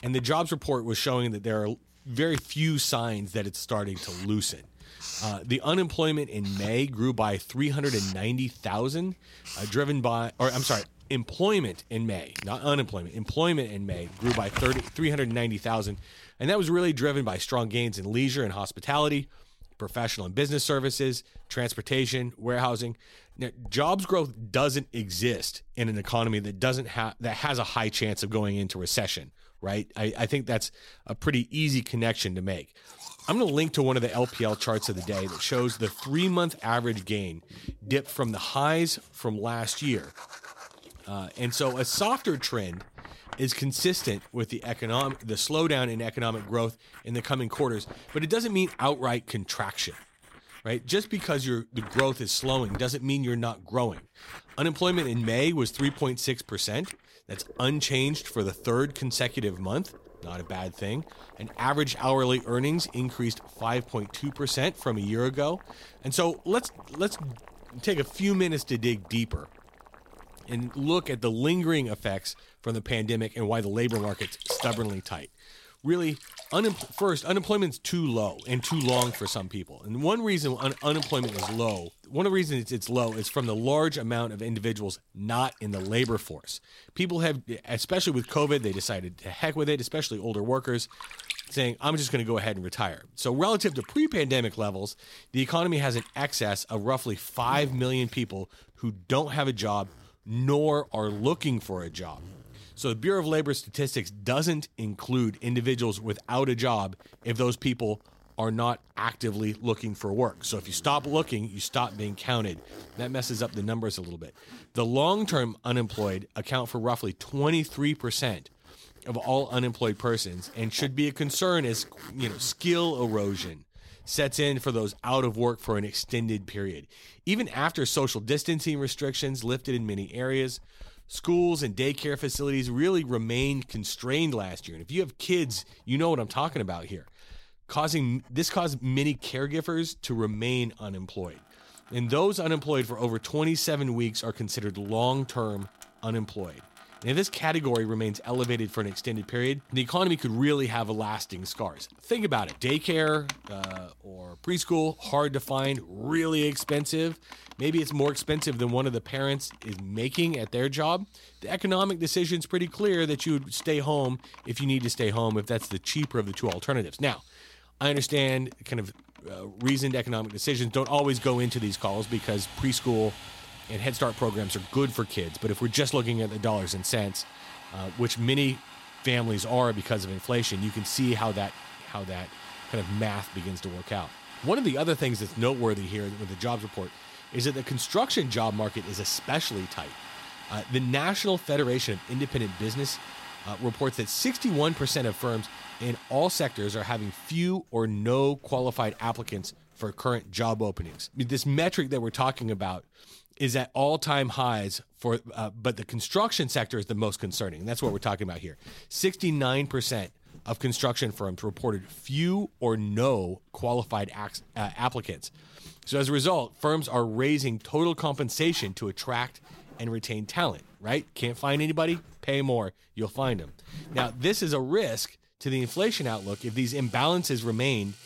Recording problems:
household noises; noticeable; throughout; 15 dB below the speech

